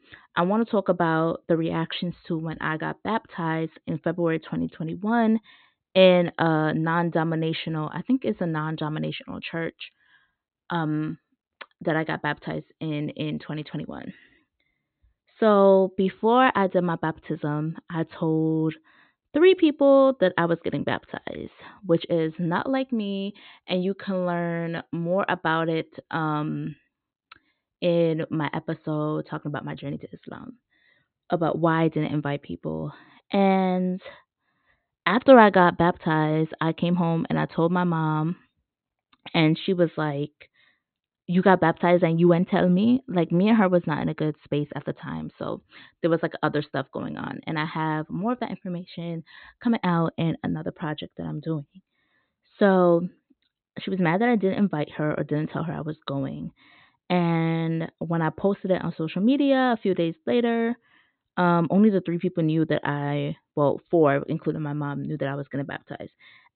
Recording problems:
high frequencies cut off; severe; nothing above 4 kHz

